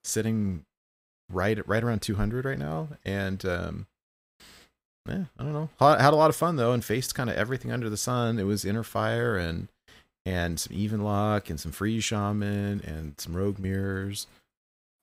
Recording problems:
none

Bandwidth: 15.5 kHz